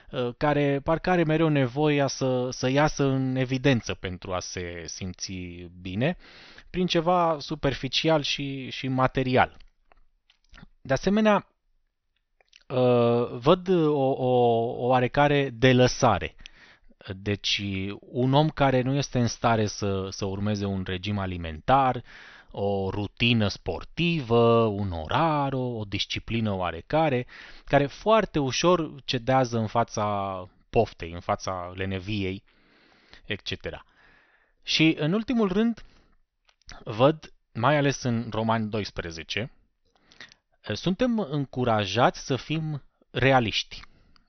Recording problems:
high frequencies cut off; noticeable; nothing above 6 kHz

